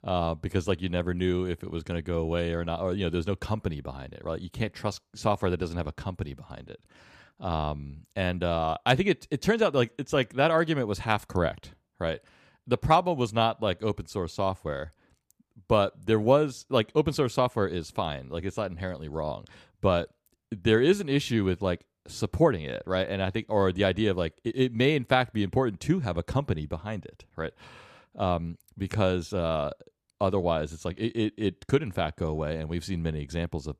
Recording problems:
none

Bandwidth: 14.5 kHz